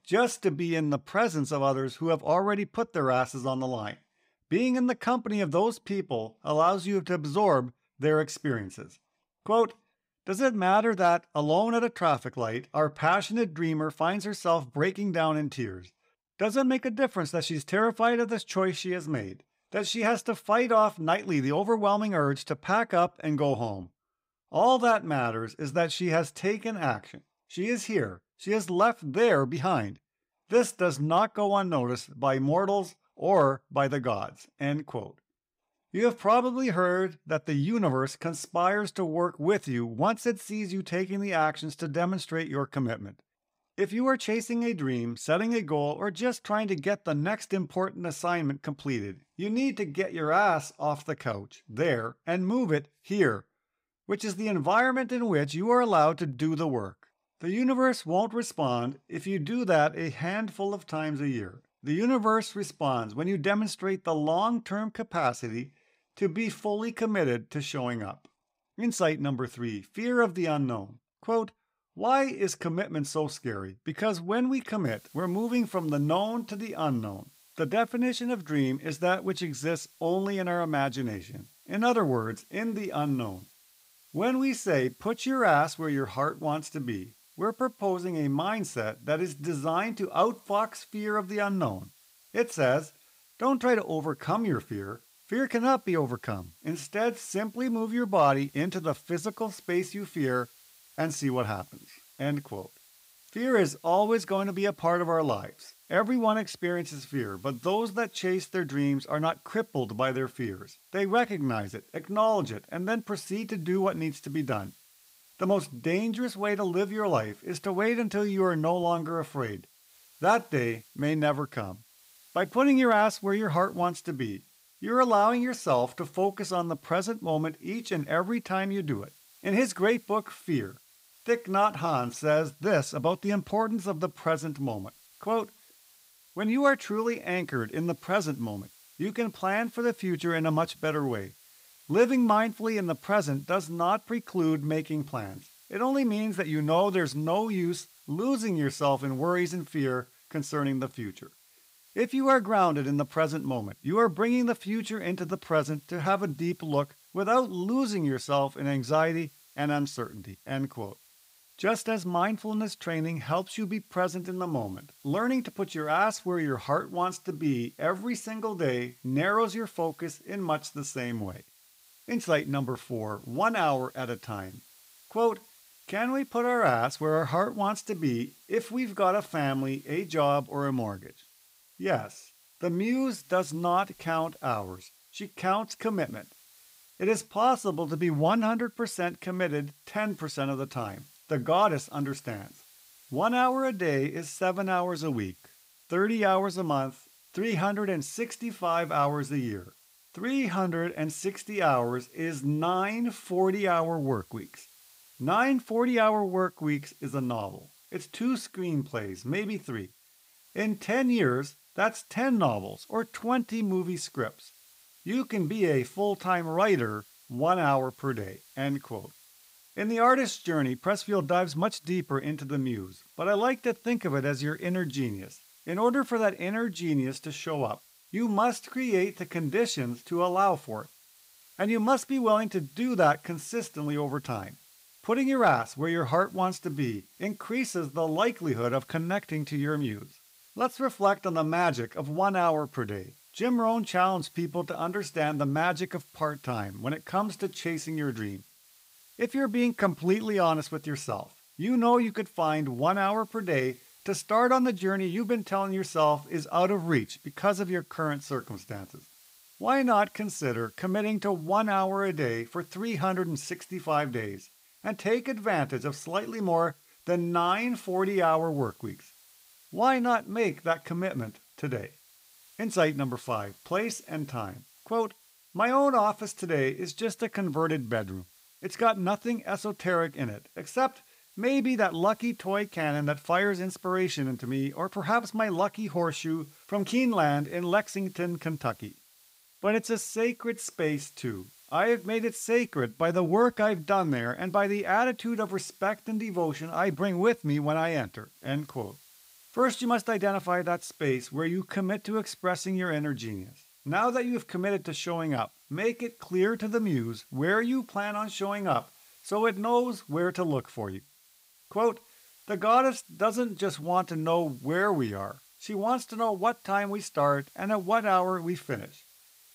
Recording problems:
hiss; faint; from 1:15 on; 25 dB below the speech

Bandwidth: 15.5 kHz